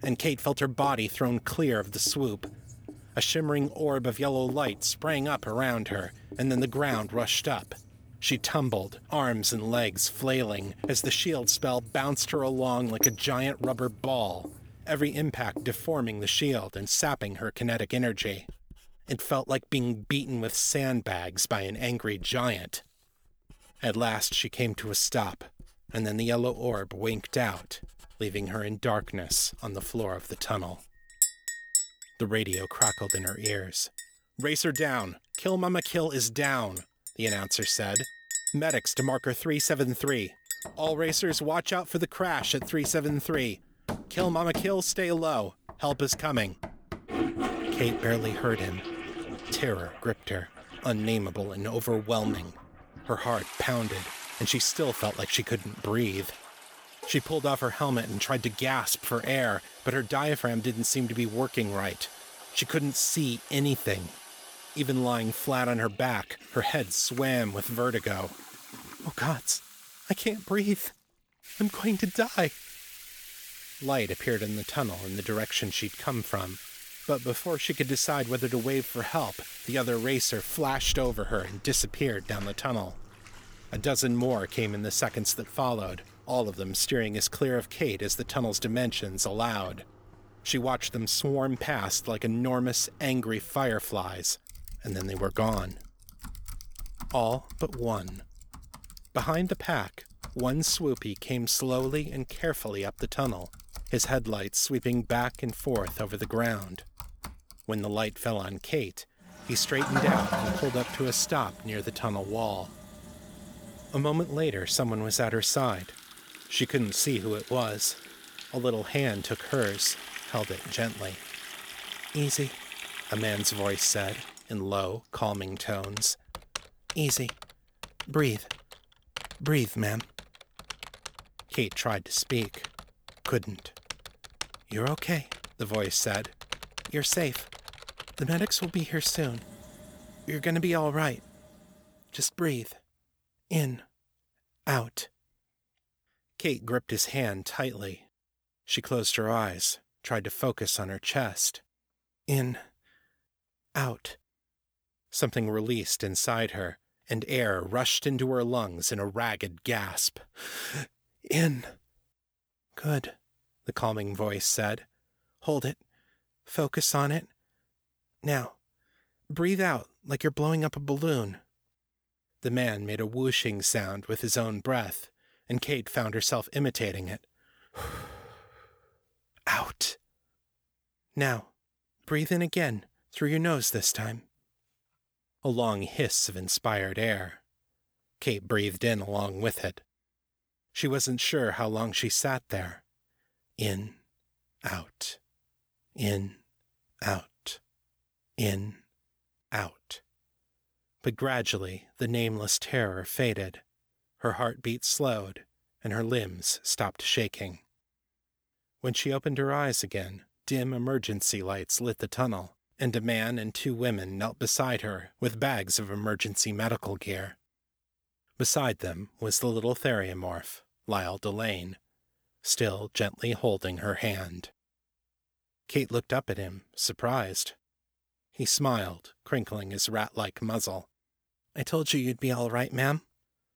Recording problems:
household noises; loud; until 2:22; 9 dB below the speech

